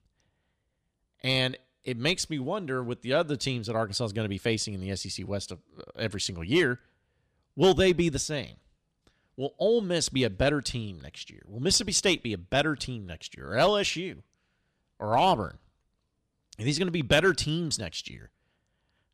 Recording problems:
none

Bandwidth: 15 kHz